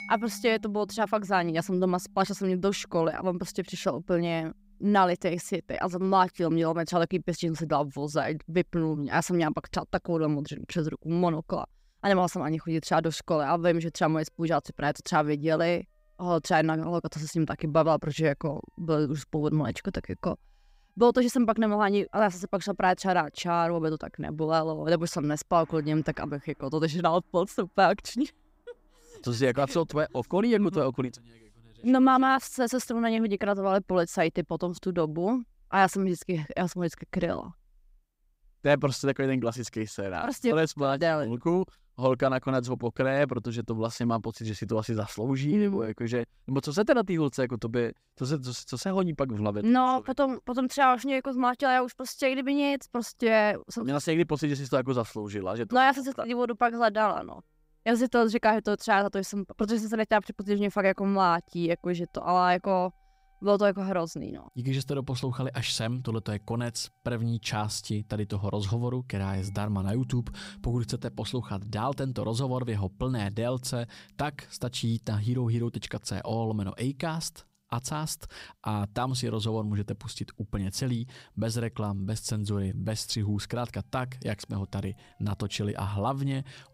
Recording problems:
background music; faint; throughout; 25 dB below the speech

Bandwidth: 15.5 kHz